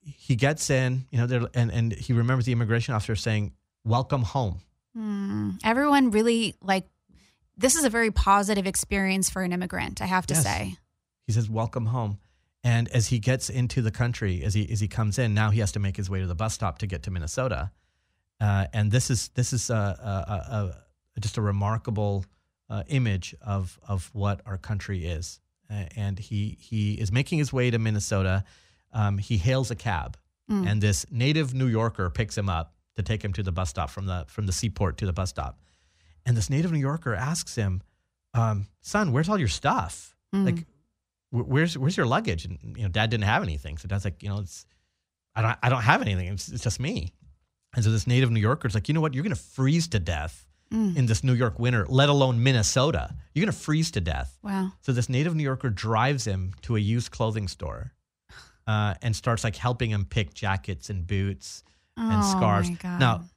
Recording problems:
none

